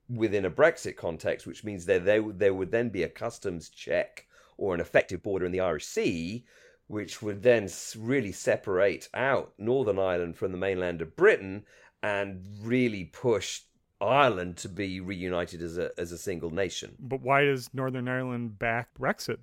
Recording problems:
uneven, jittery; strongly; from 5 to 15 s

